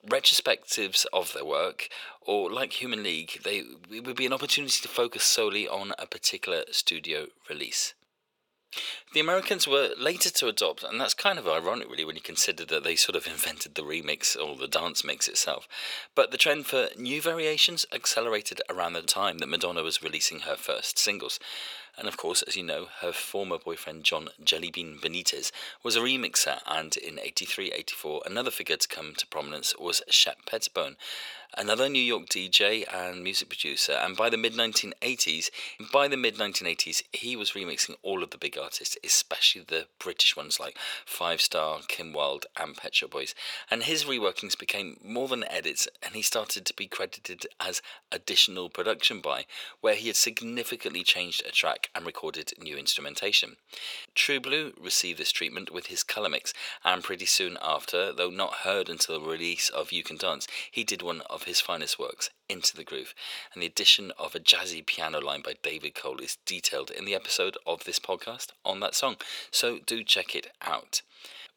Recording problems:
thin; very; fading below 500 Hz

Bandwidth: 18.5 kHz